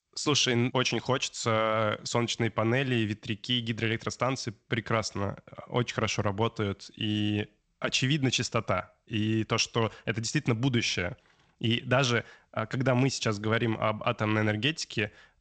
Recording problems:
garbled, watery; slightly; nothing above 8 kHz

